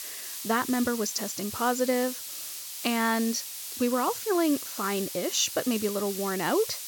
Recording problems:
high frequencies cut off; noticeable; nothing above 7.5 kHz
hiss; loud; throughout; 7 dB below the speech

